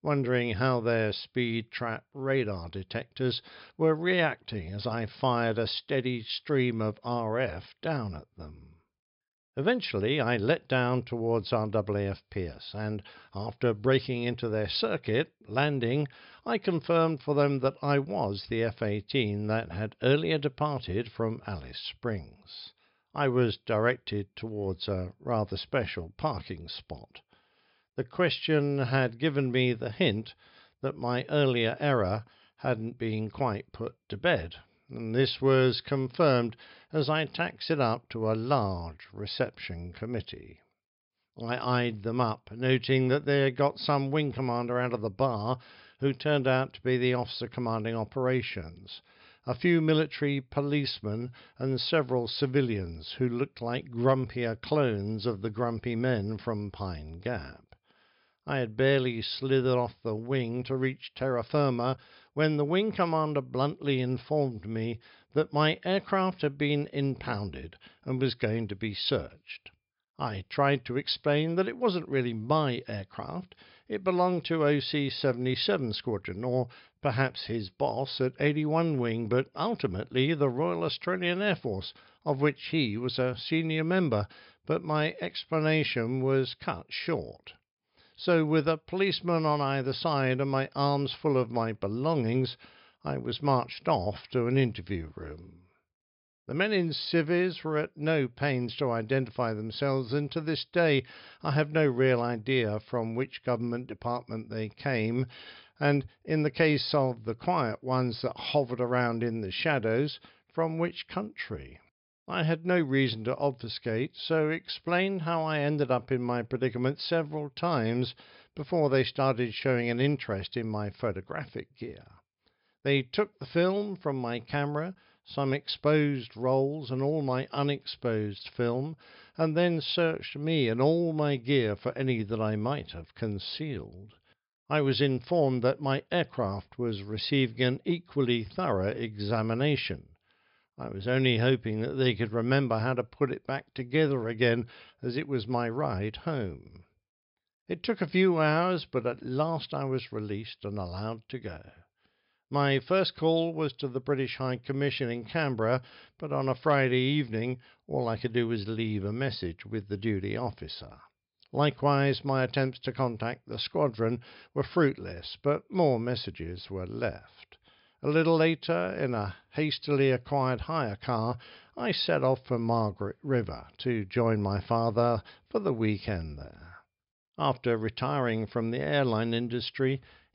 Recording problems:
high frequencies cut off; noticeable; nothing above 5.5 kHz

